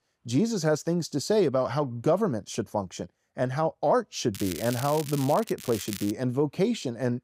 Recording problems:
crackling; noticeable; from 4.5 to 5.5 s and at 5.5 s; 10 dB below the speech

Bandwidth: 15.5 kHz